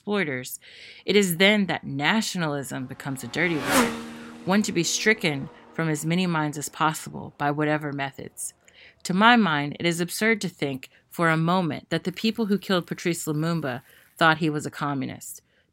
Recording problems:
traffic noise; loud; throughout; 5 dB below the speech

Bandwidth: 16 kHz